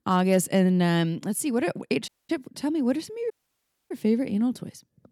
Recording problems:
audio cutting out; at 2 s and at 3.5 s for 0.5 s

